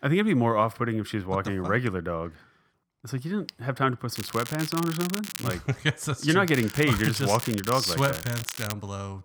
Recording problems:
crackling; loud; from 4 to 5.5 s and from 6.5 to 8.5 s; 9 dB below the speech

